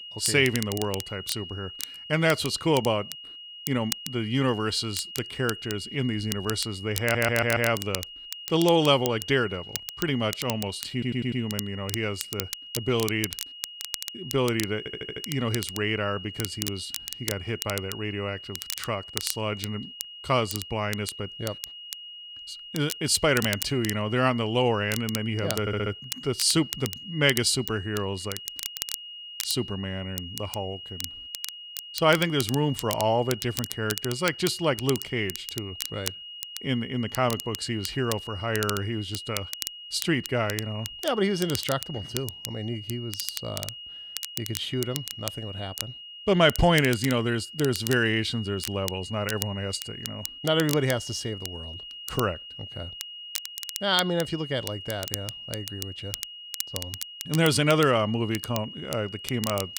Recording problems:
crackle, like an old record; loud; 9 dB below the speech
high-pitched whine; noticeable; throughout; 3 kHz, 10 dB below the speech
audio stuttering; 4 times, first at 7 s

